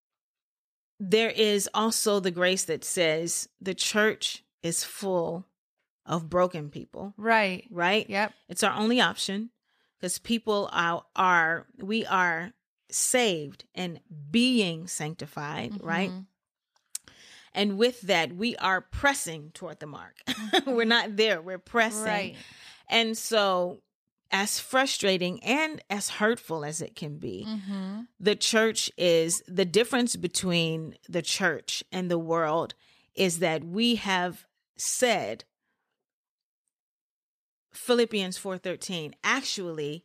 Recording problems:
none

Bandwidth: 14.5 kHz